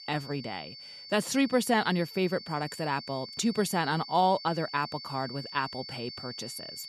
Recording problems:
high-pitched whine; noticeable; throughout; 4.5 kHz, 10 dB below the speech

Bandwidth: 13.5 kHz